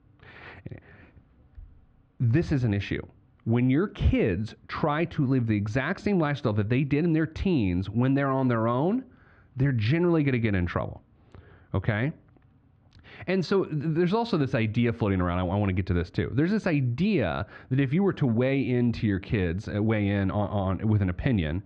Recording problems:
muffled; slightly; fading above 3 kHz

